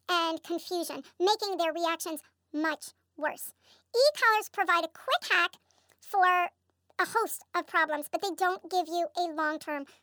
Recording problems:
wrong speed and pitch; too fast and too high; 1.5 times normal speed

